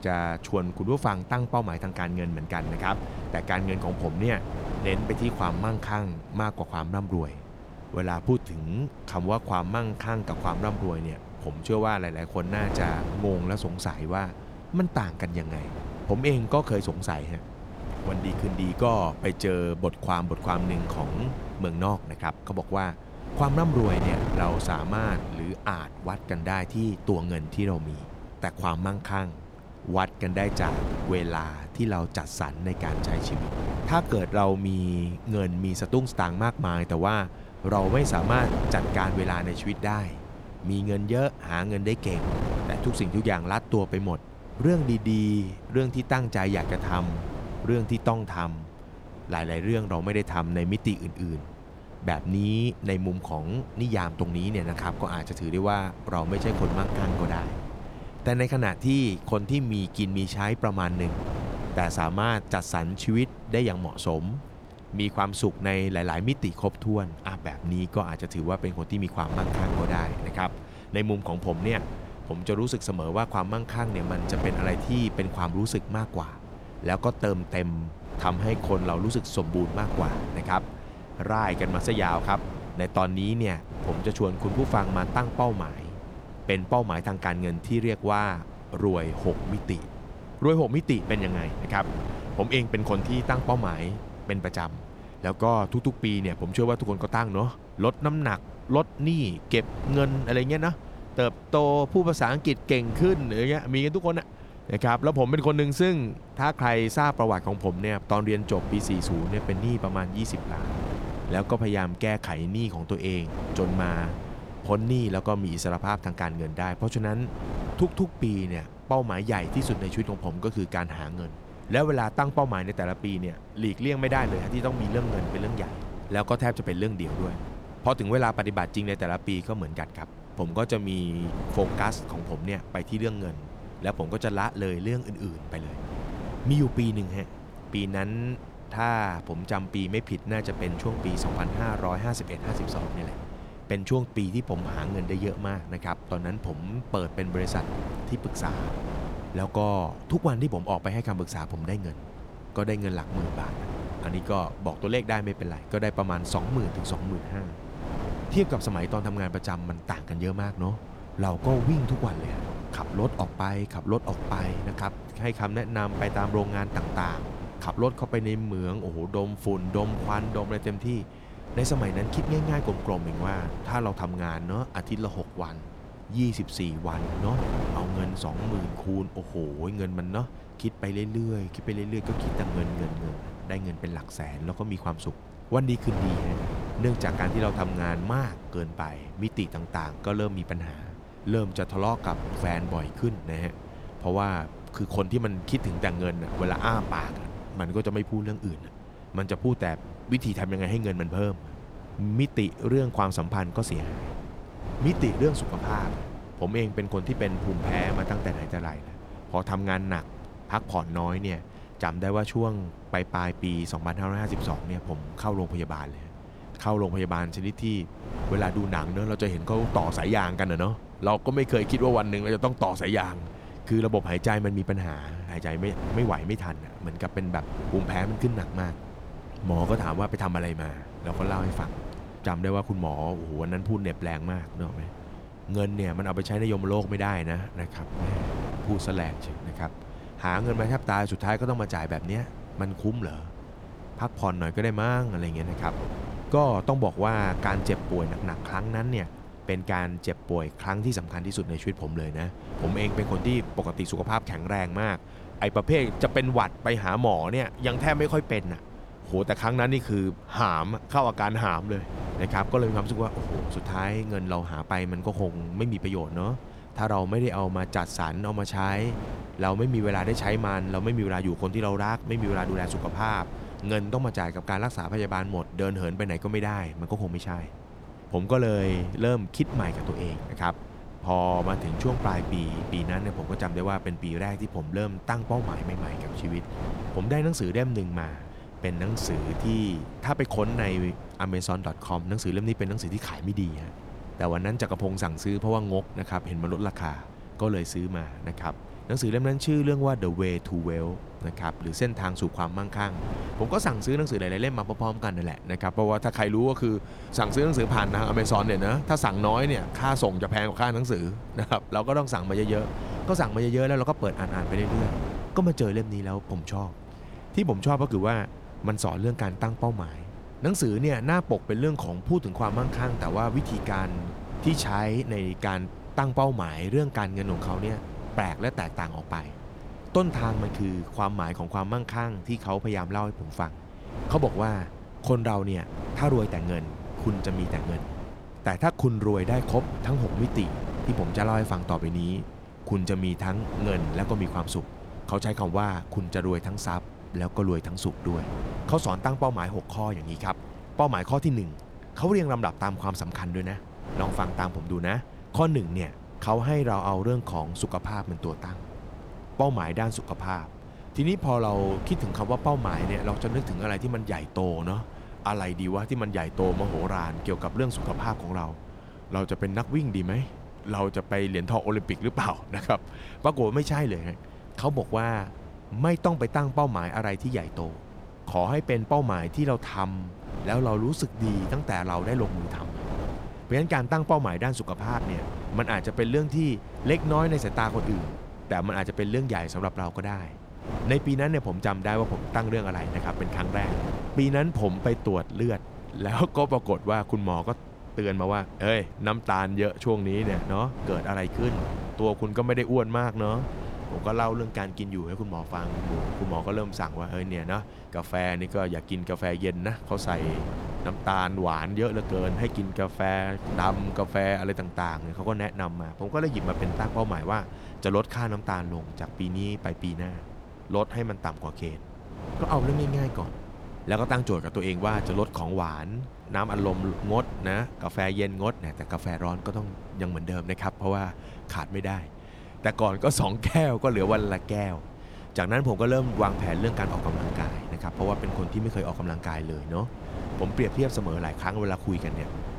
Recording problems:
wind noise on the microphone; occasional gusts; 10 dB below the speech

